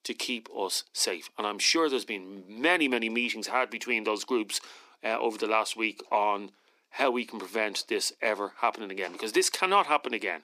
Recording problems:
thin; somewhat; fading below 250 Hz

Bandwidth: 15 kHz